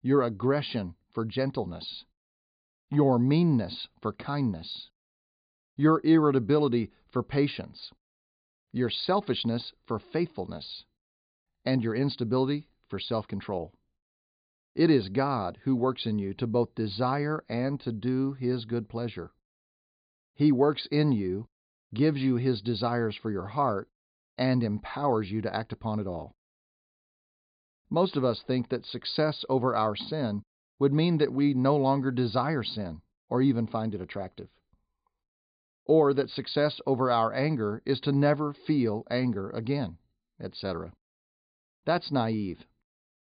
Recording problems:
high frequencies cut off; severe; nothing above 5 kHz

